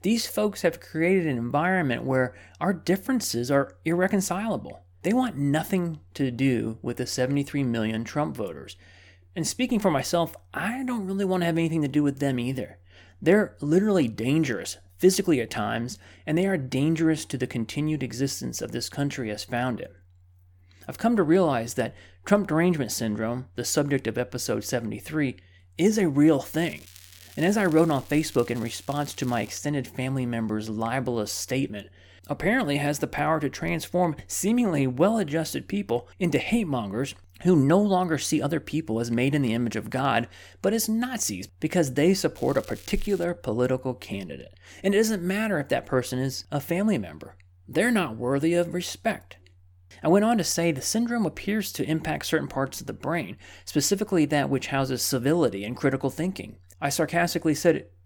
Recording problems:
crackling; faint; from 27 to 30 s and at 42 s; 20 dB below the speech

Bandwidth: 18 kHz